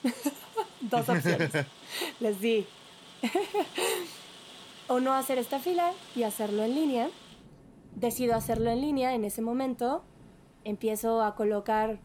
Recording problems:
rain or running water; noticeable; throughout; 20 dB below the speech

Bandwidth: 17.5 kHz